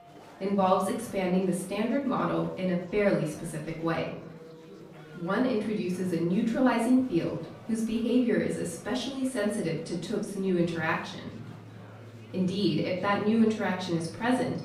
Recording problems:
off-mic speech; far
room echo; noticeable; dies away in 0.6 s
background music; faint; throughout; 25 dB below the speech
chatter from many people; faint; throughout; 20 dB below the speech

